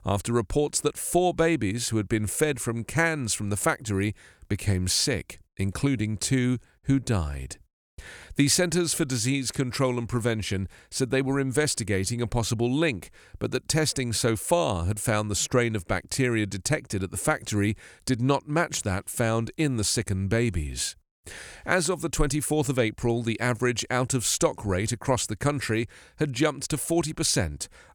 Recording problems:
none

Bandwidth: 18.5 kHz